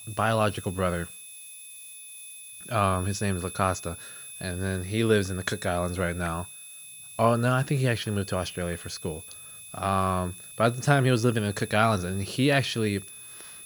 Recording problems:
high-pitched whine; noticeable; throughout; 11 kHz, 15 dB below the speech
hiss; faint; throughout; 25 dB below the speech

